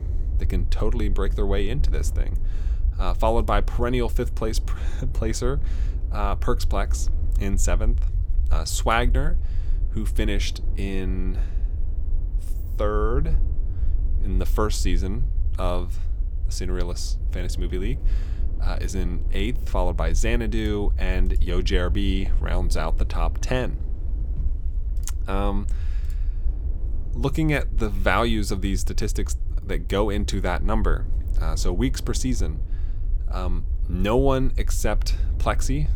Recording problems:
wind noise on the microphone; occasional gusts; 25 dB below the speech
low rumble; faint; throughout; 20 dB below the speech

